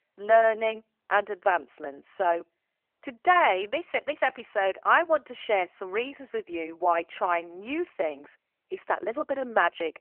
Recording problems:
phone-call audio; nothing above 3 kHz

